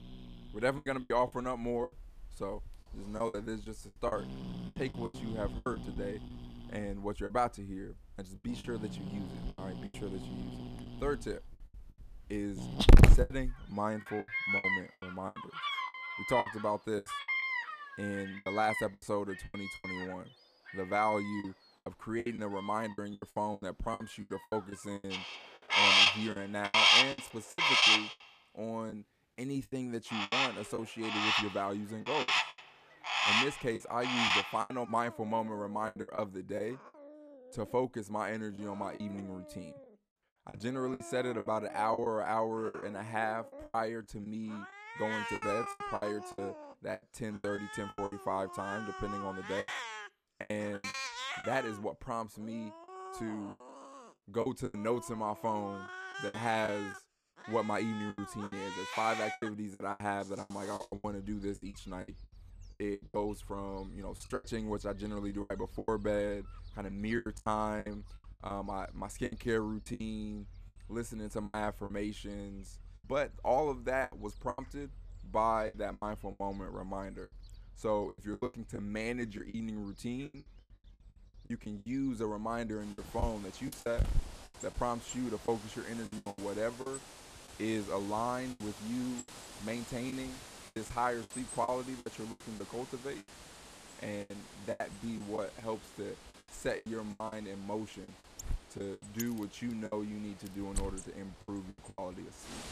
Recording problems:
animal sounds; very loud; throughout; 5 dB above the speech
choppy; very; 12% of the speech affected

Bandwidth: 14.5 kHz